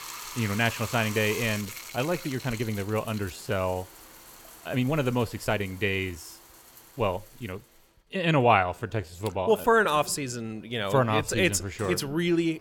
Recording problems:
household noises; noticeable; throughout; 15 dB below the speech
uneven, jittery; strongly; from 1.5 to 11 s

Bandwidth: 17 kHz